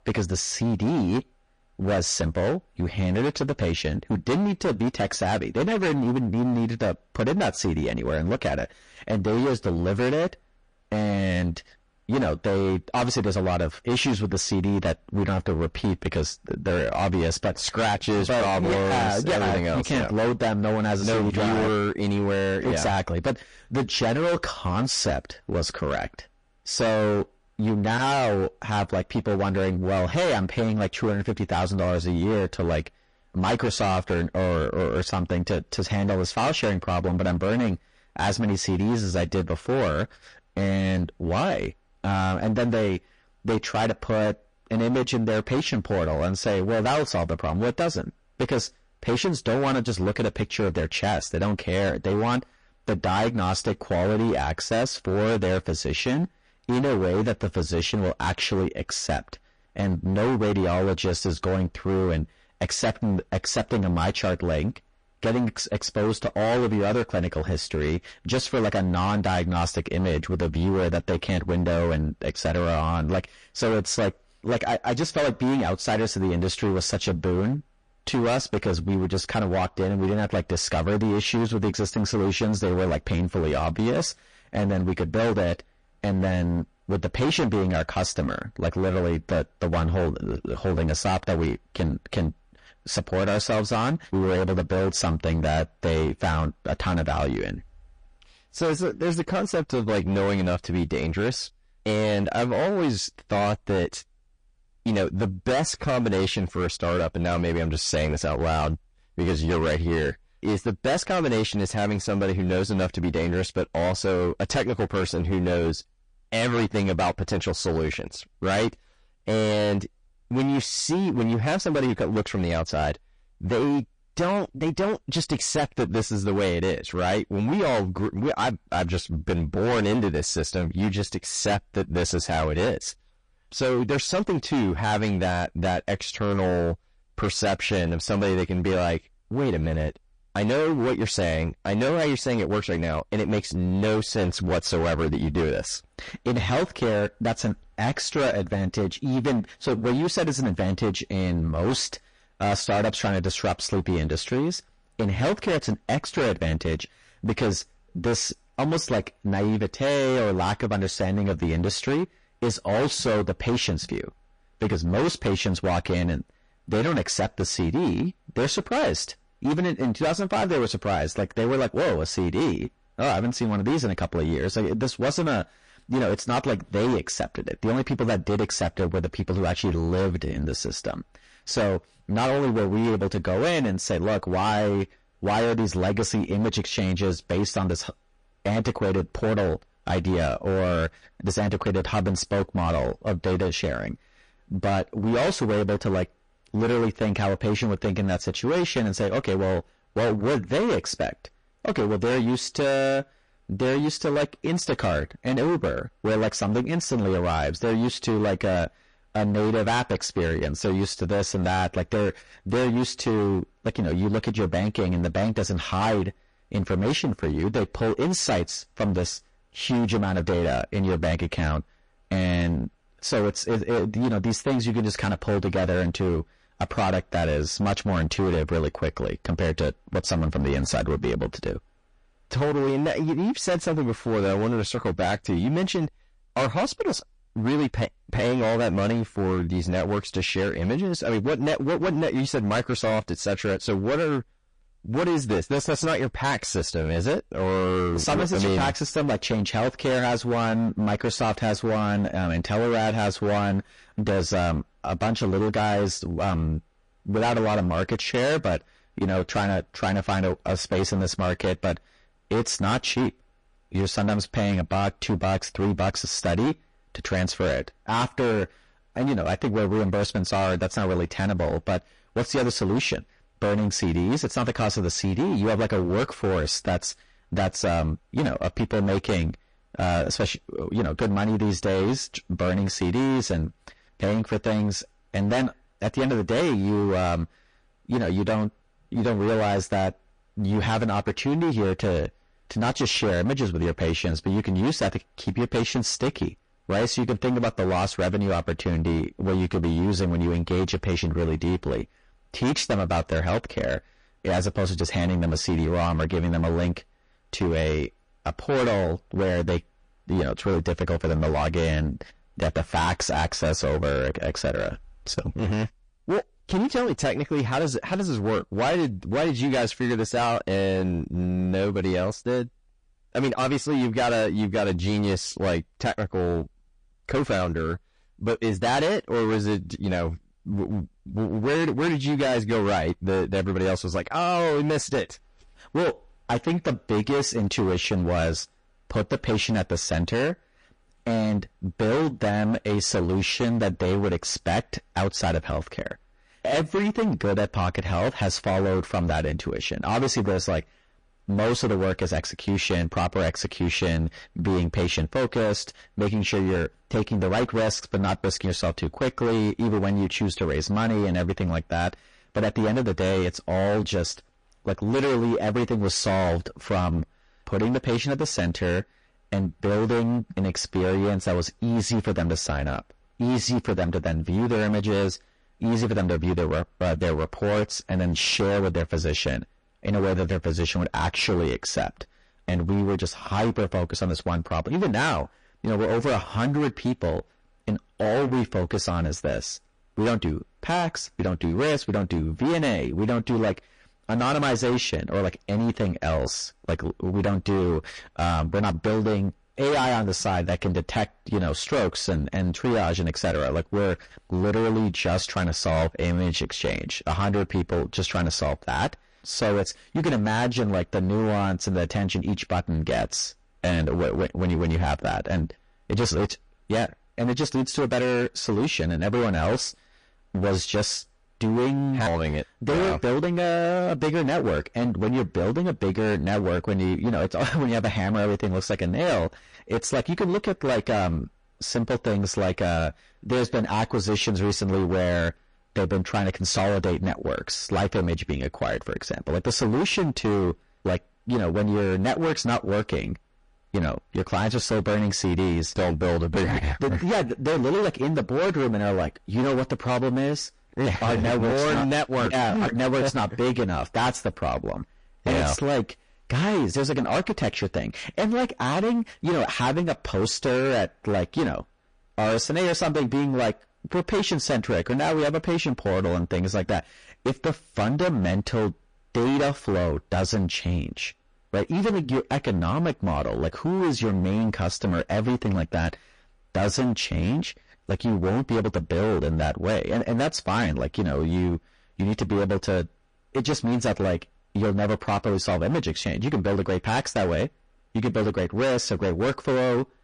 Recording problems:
distortion; heavy; 21% of the sound clipped
garbled, watery; slightly; nothing above 9 kHz

